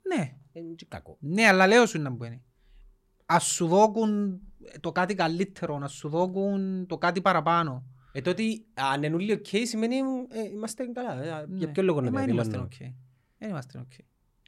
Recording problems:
none

